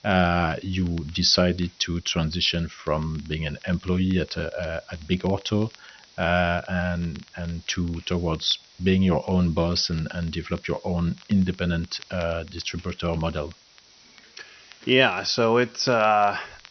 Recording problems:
high frequencies cut off; noticeable; nothing above 6 kHz
hiss; faint; throughout; 25 dB below the speech
crackle, like an old record; faint; 25 dB below the speech

